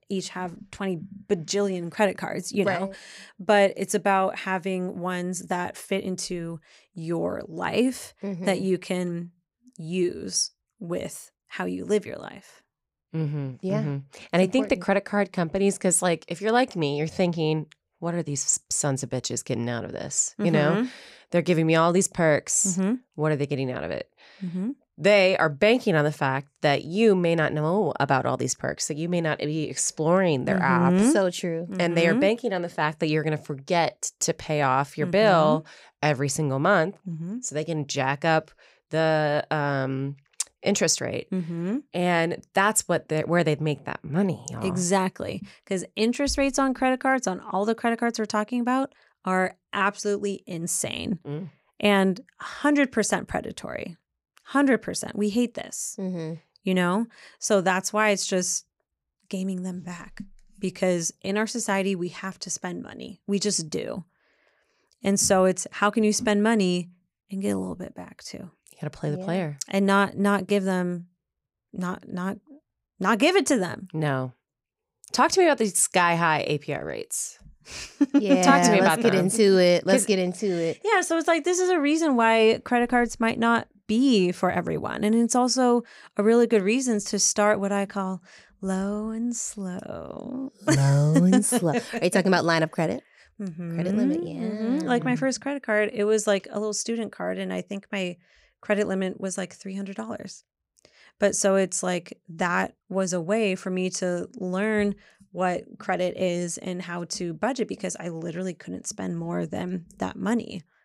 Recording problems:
none

